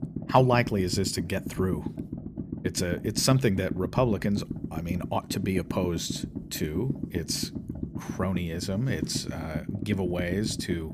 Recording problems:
low rumble; noticeable; throughout; 10 dB below the speech

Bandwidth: 15 kHz